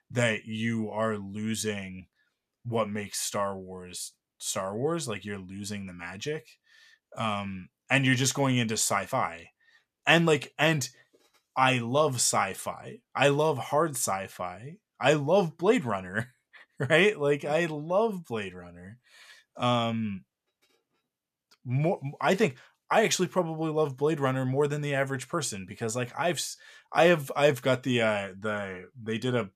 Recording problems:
none

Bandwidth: 14.5 kHz